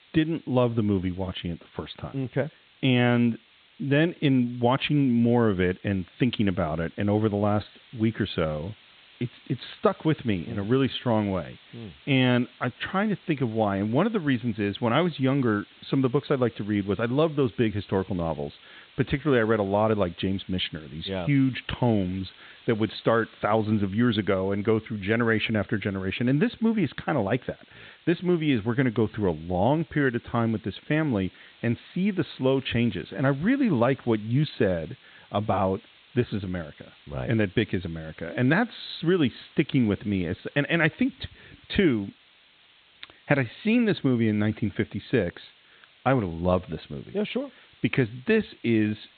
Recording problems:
high frequencies cut off; severe; nothing above 4 kHz
hiss; faint; throughout; 25 dB below the speech

